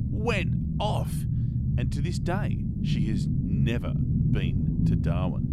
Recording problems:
low rumble; loud; throughout; 2 dB below the speech

